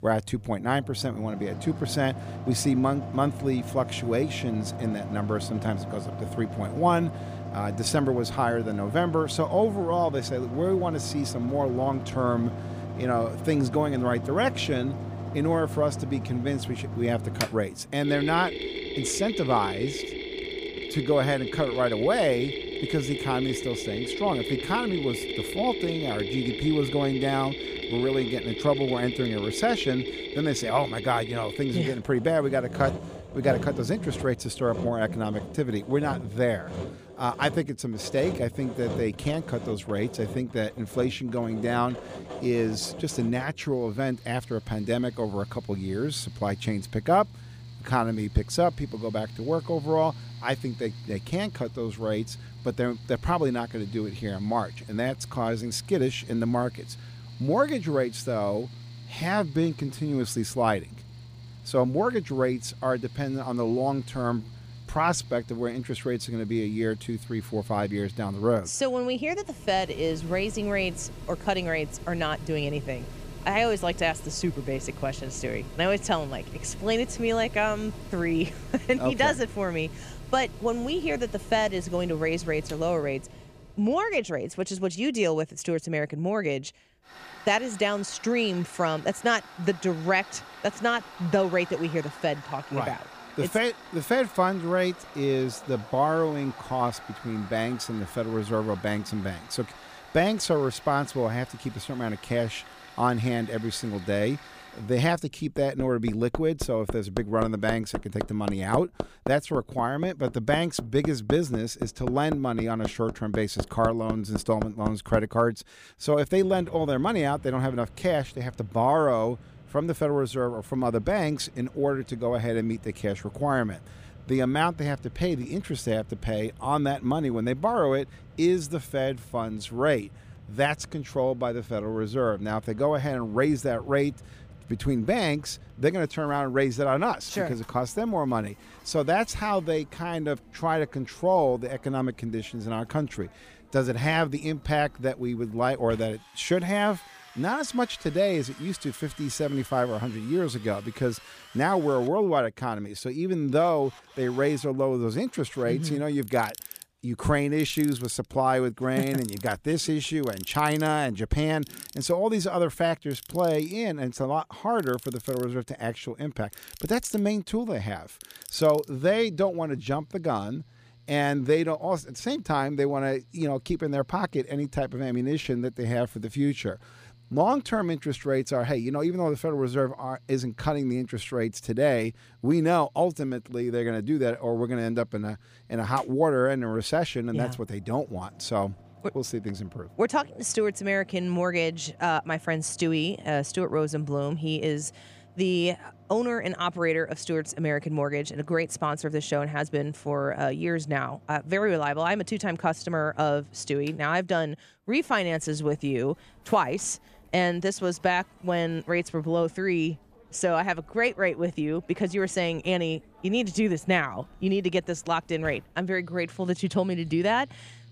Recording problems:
machinery noise; noticeable; throughout; 10 dB below the speech

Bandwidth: 15 kHz